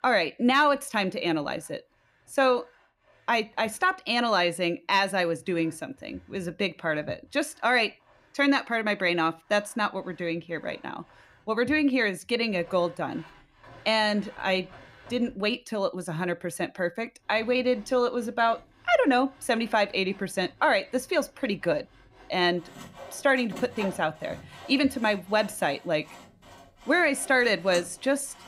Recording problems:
machinery noise; faint; throughout; 25 dB below the speech

